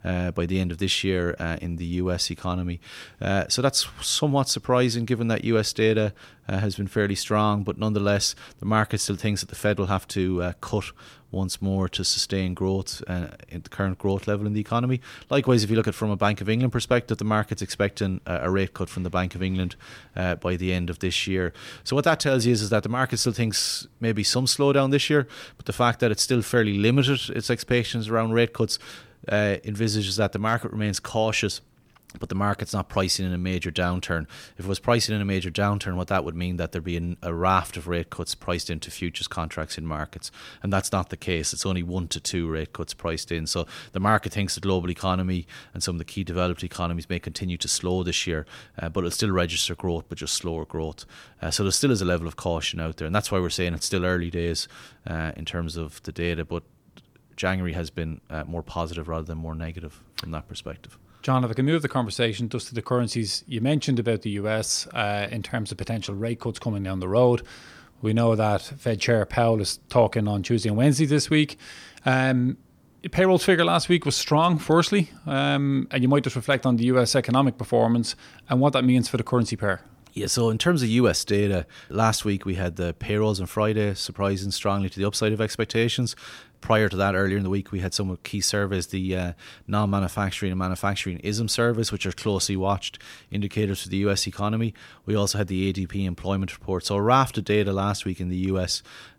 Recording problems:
none

